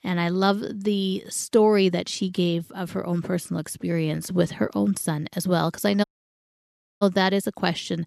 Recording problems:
audio cutting out; at 6 s for 1 s

